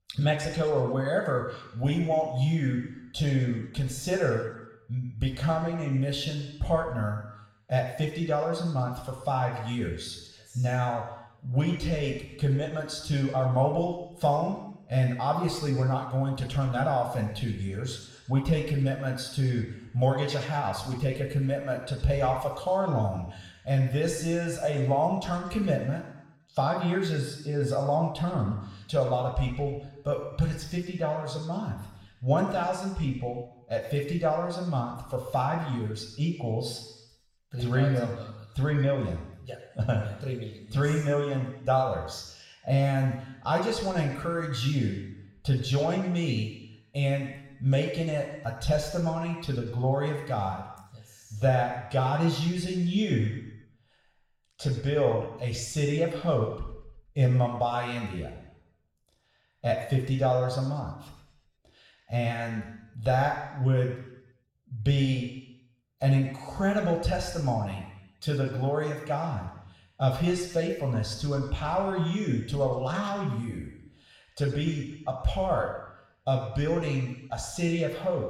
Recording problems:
room echo; noticeable; dies away in 0.9 s
off-mic speech; somewhat distant

